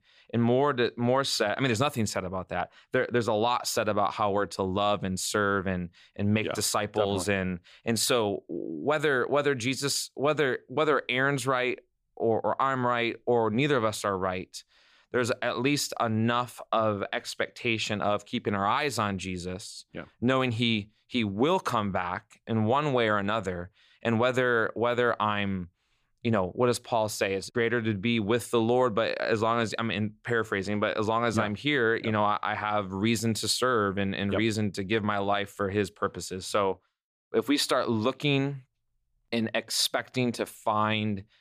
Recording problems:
none

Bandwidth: 15 kHz